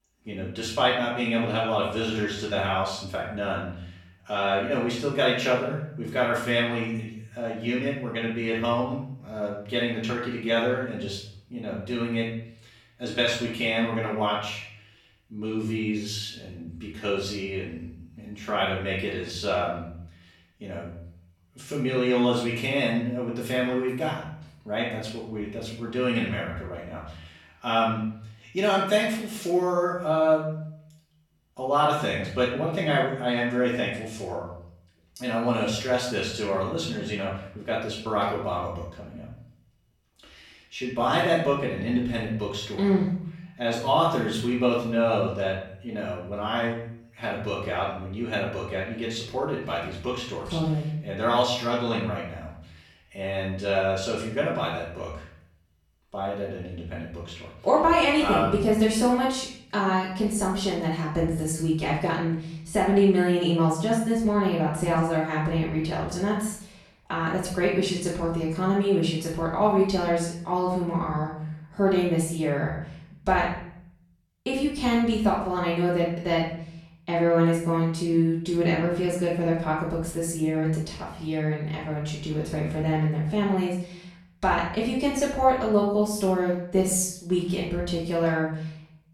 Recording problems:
off-mic speech; far
room echo; noticeable; dies away in 0.6 s

